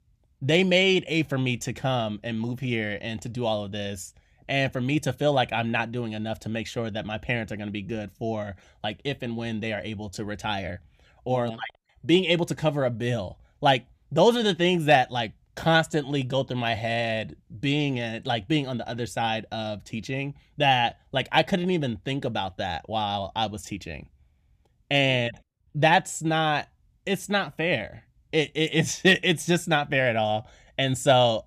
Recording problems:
none

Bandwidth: 14.5 kHz